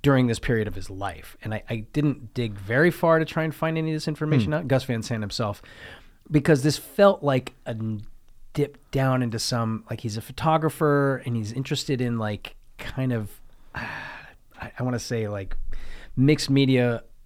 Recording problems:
none

